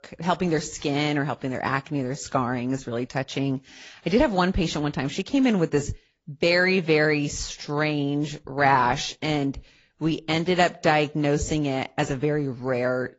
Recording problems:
high frequencies cut off; noticeable; nothing above 7.5 kHz
garbled, watery; slightly

